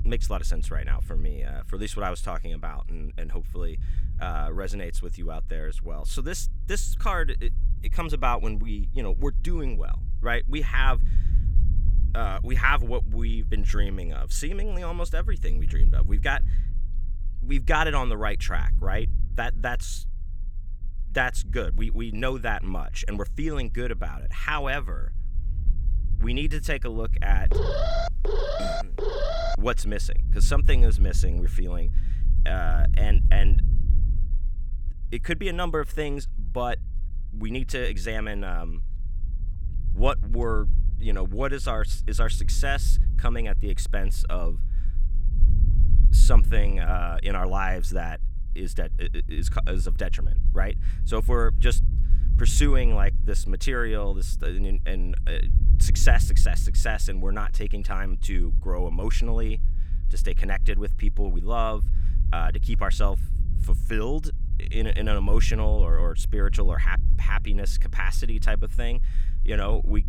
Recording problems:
low rumble; noticeable; throughout; 20 dB below the speech
alarm; loud; from 28 to 30 s; peak 3 dB above the speech

